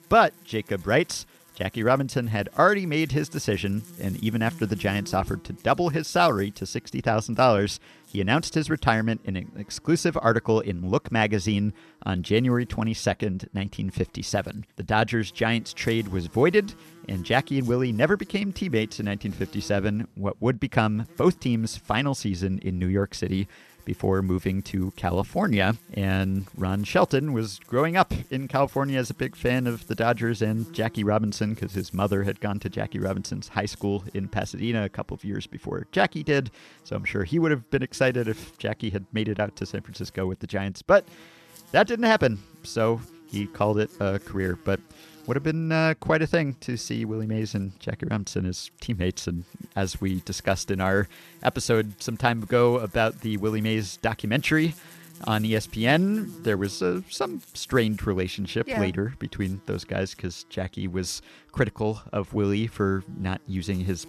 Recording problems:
electrical hum; faint; throughout; 50 Hz, 25 dB below the speech

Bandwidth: 13.5 kHz